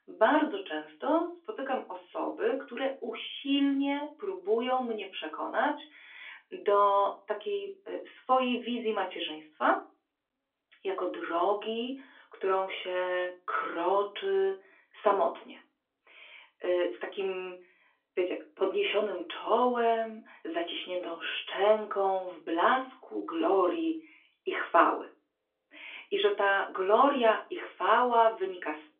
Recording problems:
off-mic speech; far
phone-call audio; nothing above 3.5 kHz
room echo; very slight; dies away in 0.2 s

